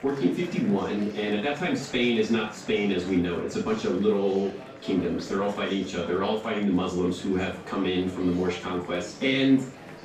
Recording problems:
off-mic speech; far
room echo; noticeable; dies away in 0.3 s
murmuring crowd; noticeable; throughout; 15 dB below the speech

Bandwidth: 15 kHz